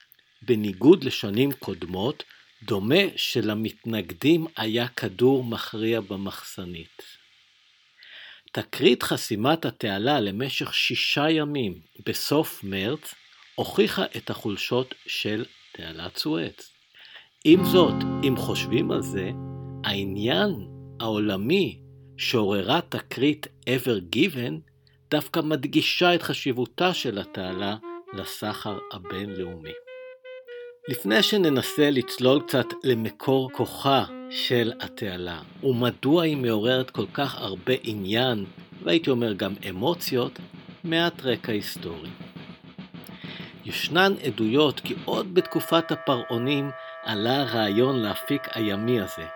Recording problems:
background music; noticeable; throughout; 15 dB below the speech

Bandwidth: 18 kHz